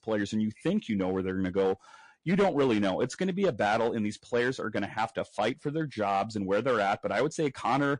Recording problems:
distortion; slight; 4% of the sound clipped
garbled, watery; slightly; nothing above 10 kHz

